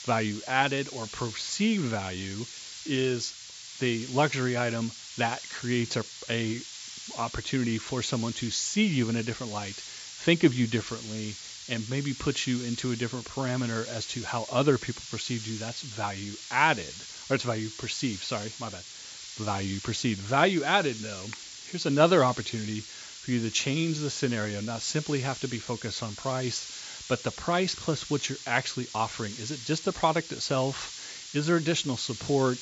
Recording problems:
high frequencies cut off; noticeable; nothing above 8 kHz
hiss; noticeable; throughout; 10 dB below the speech

